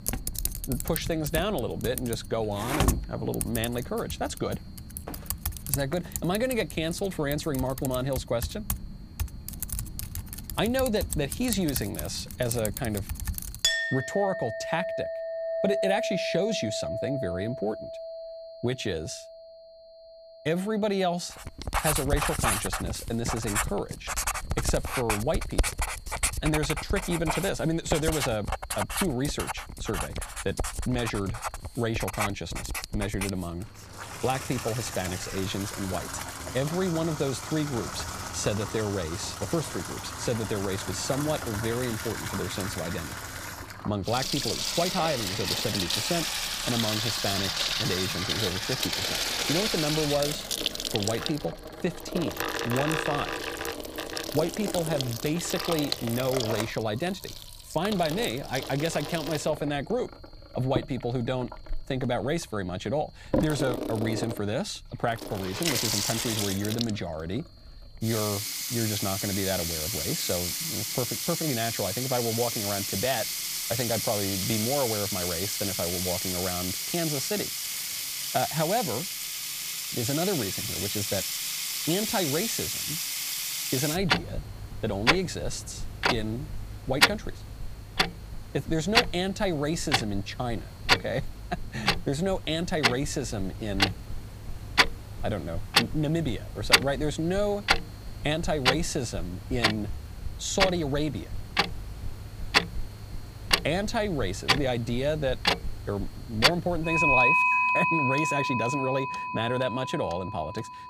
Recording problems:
household noises; very loud; throughout; 1 dB above the speech
high-pitched whine; faint; throughout; 4 kHz, 30 dB below the speech

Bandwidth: 15 kHz